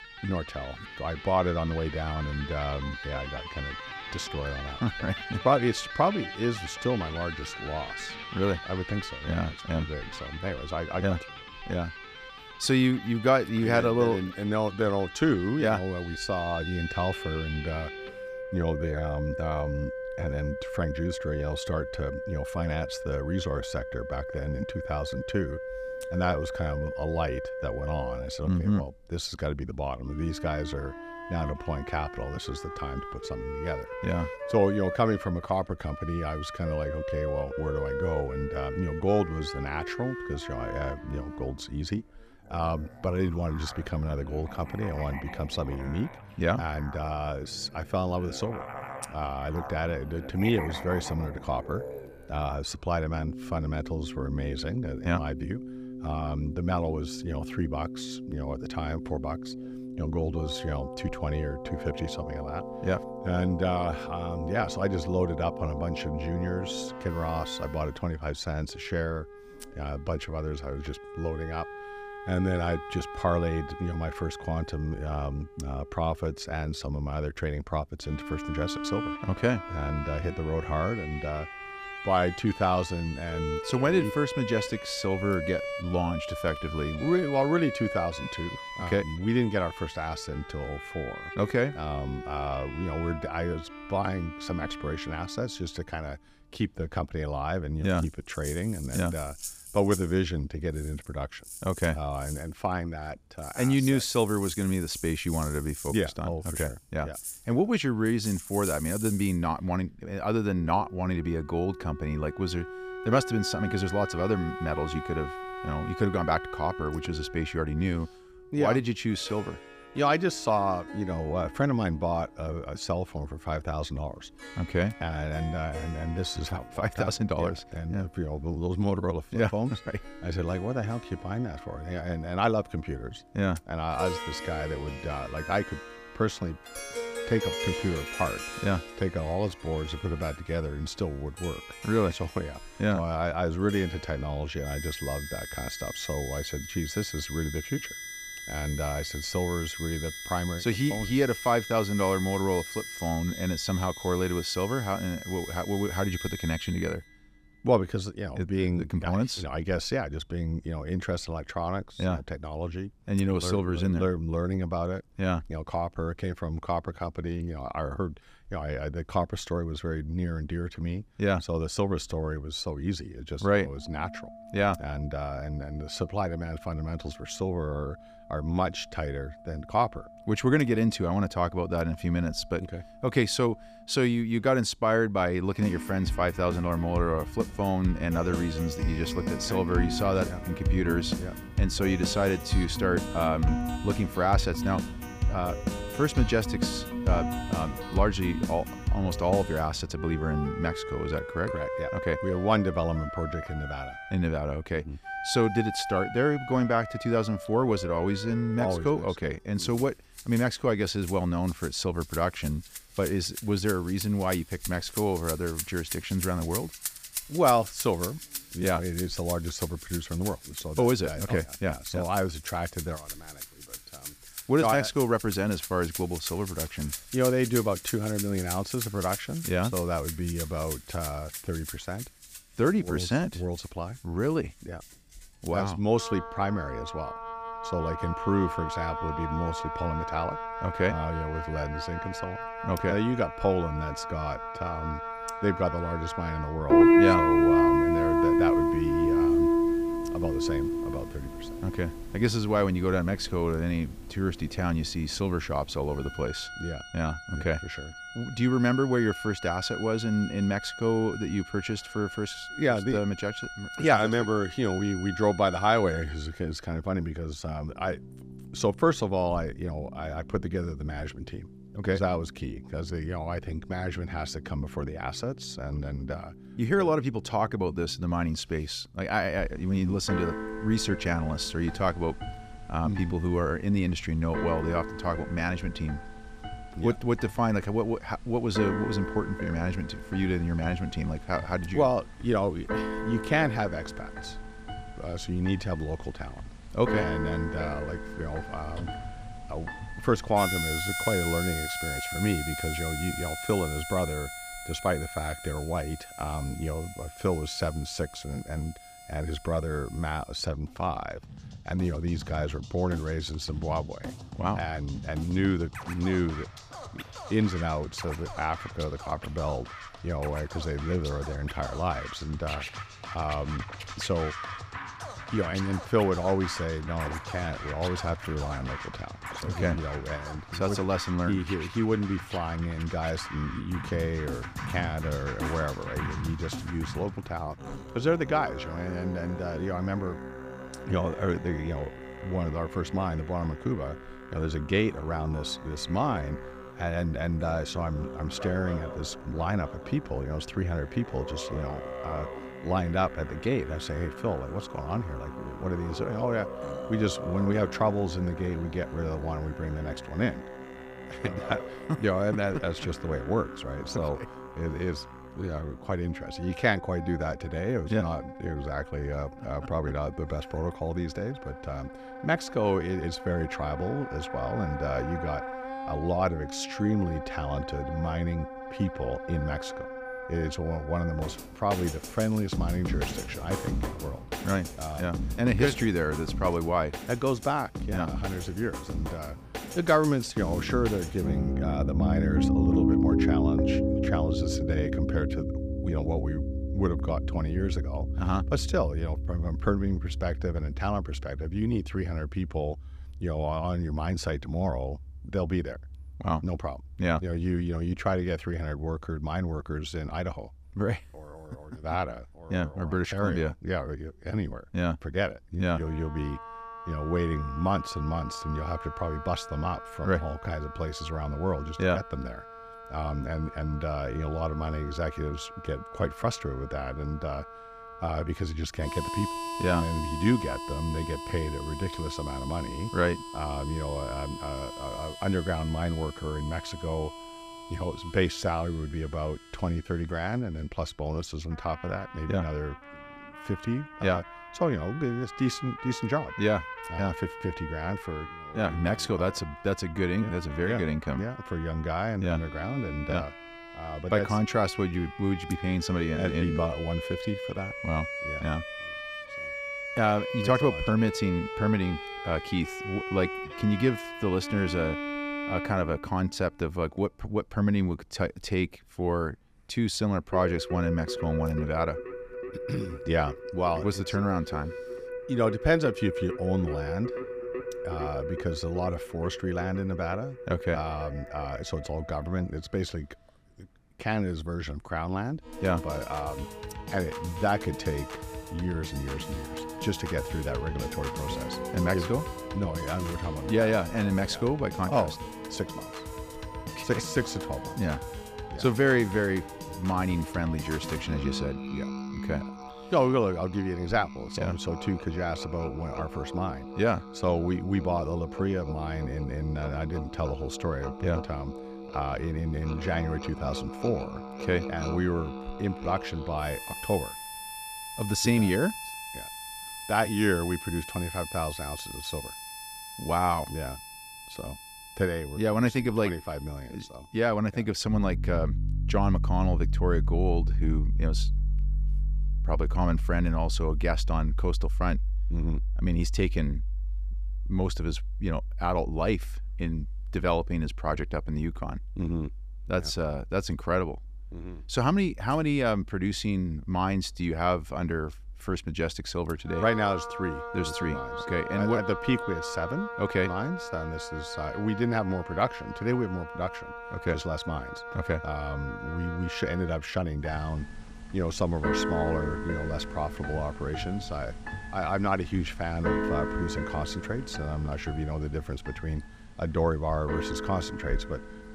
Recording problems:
background music; loud; throughout; 6 dB below the speech

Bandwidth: 15 kHz